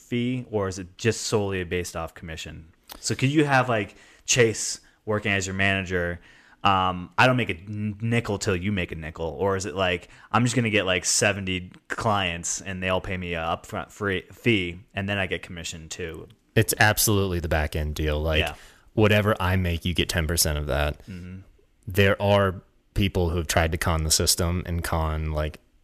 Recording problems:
none

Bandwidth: 14.5 kHz